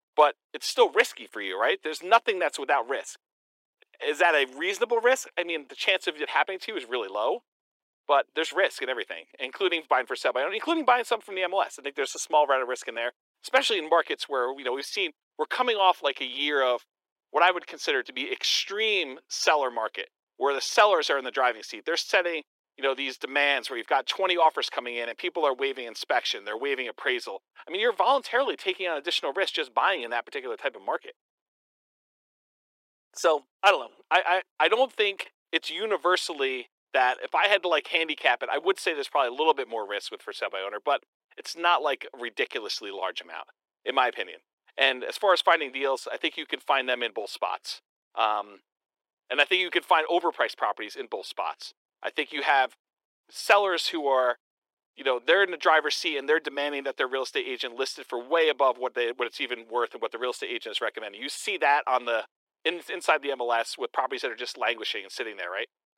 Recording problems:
thin; very; fading below 350 Hz

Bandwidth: 16 kHz